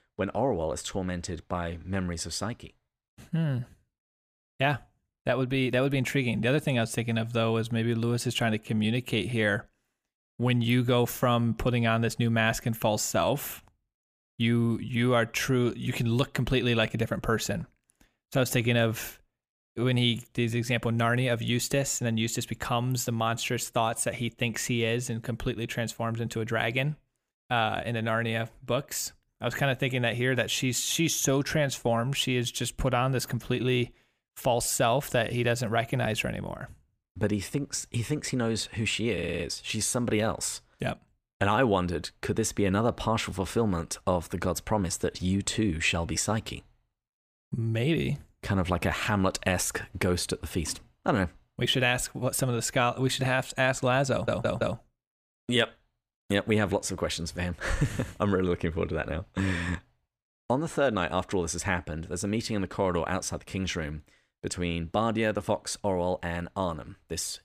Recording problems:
audio stuttering; at 39 s and at 54 s

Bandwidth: 15 kHz